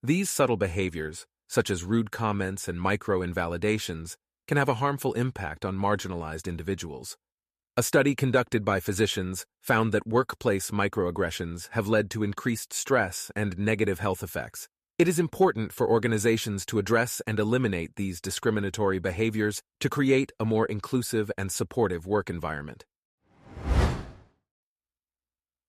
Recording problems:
none

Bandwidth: 14.5 kHz